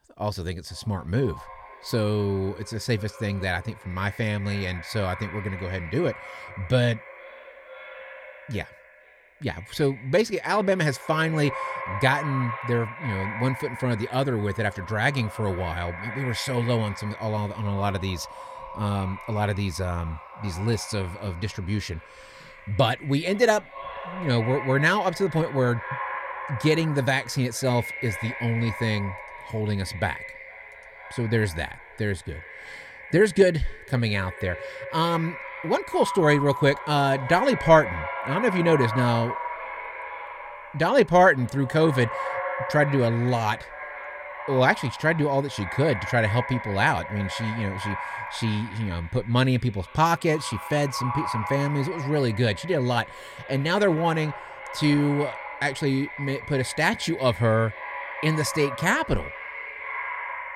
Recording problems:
echo of what is said; strong; throughout; 460 ms later, 10 dB below the speech

